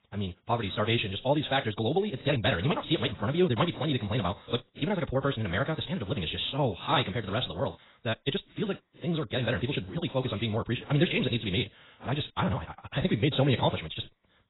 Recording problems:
garbled, watery; badly; nothing above 4 kHz
wrong speed, natural pitch; too fast; 1.7 times normal speed

